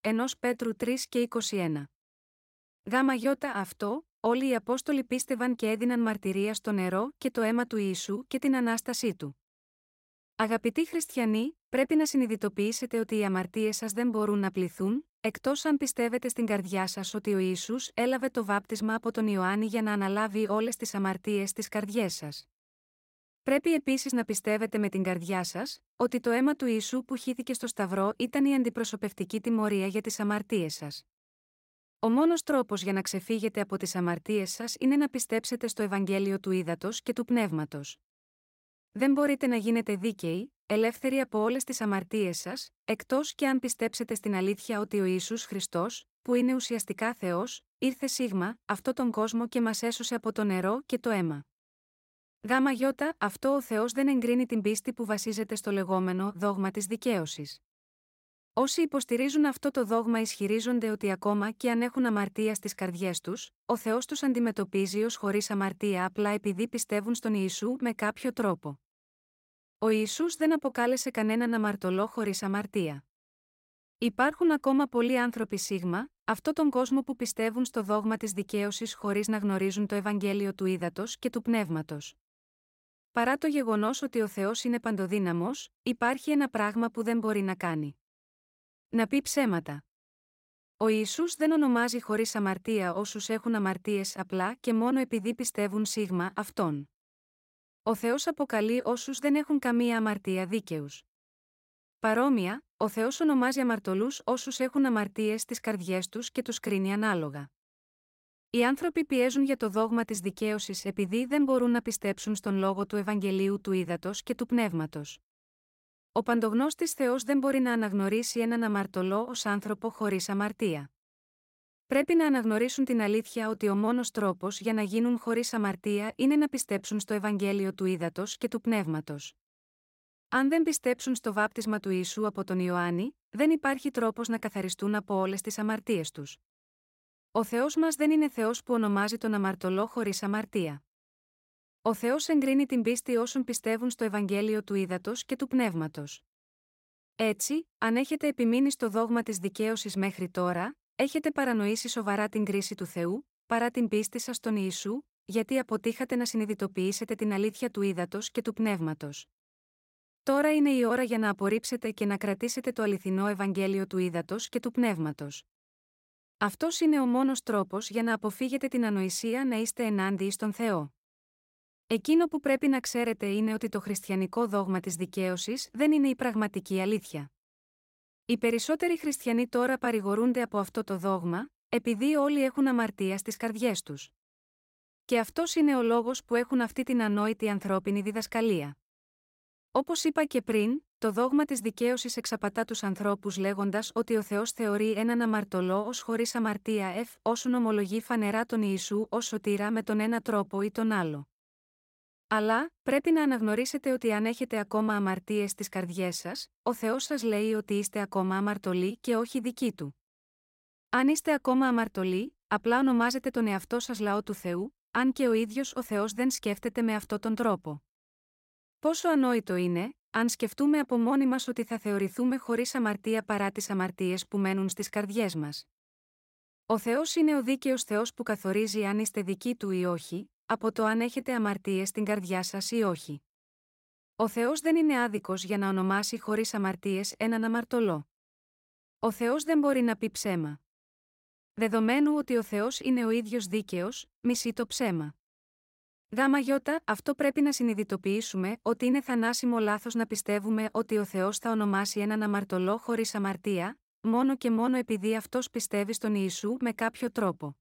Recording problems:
none

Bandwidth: 16 kHz